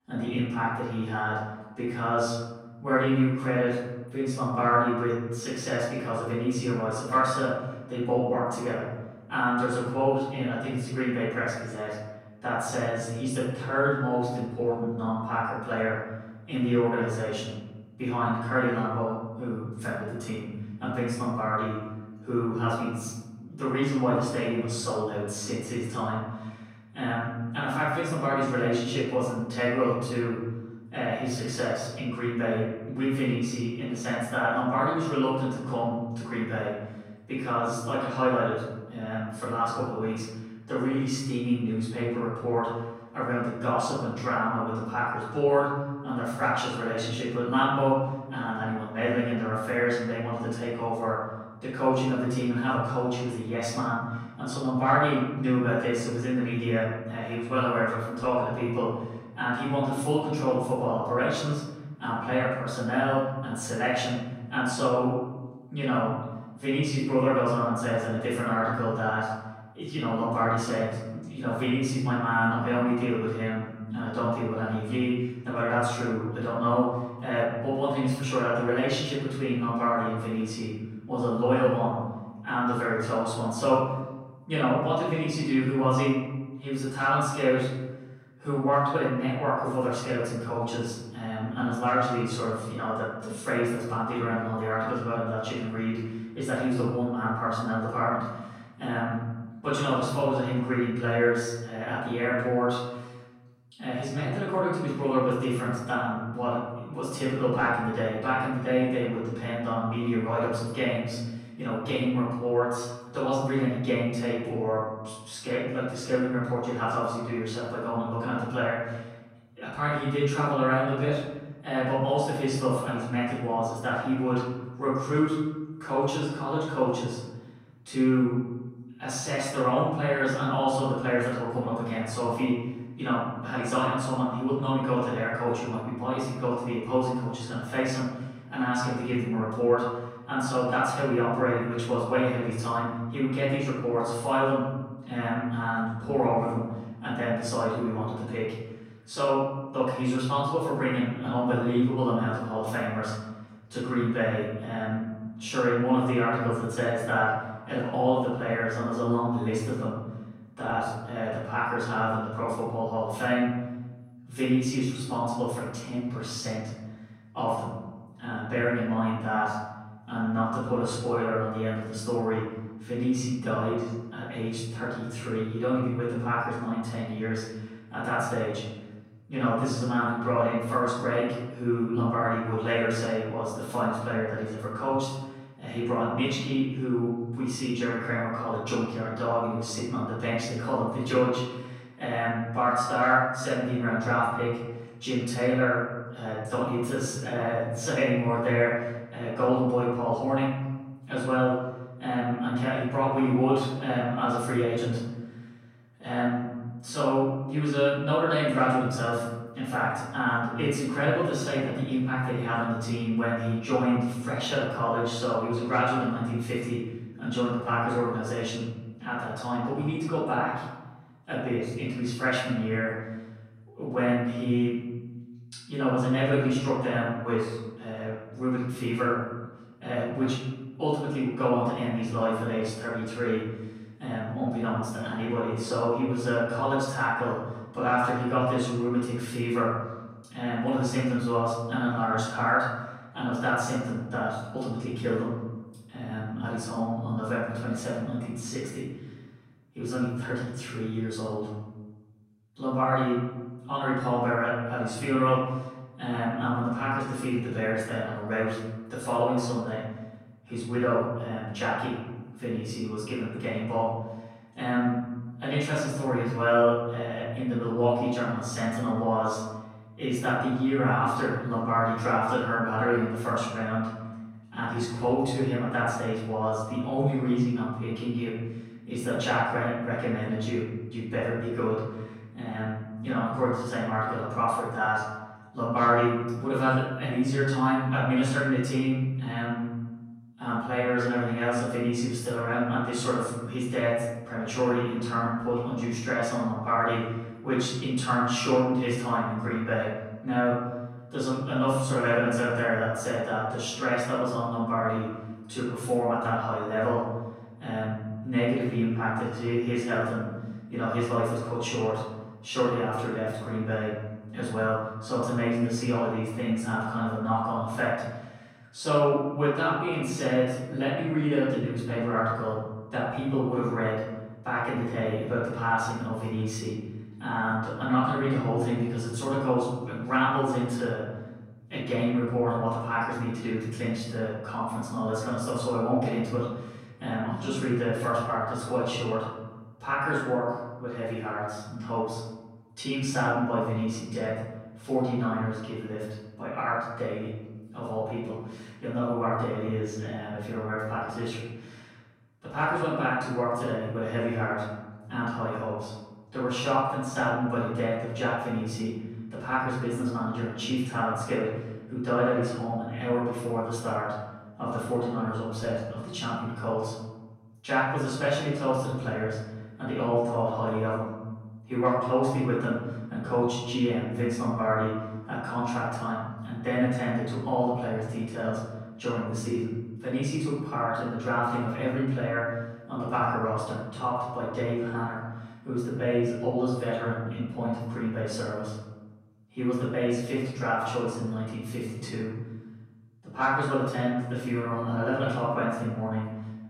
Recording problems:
off-mic speech; far
room echo; noticeable; dies away in 1.2 s

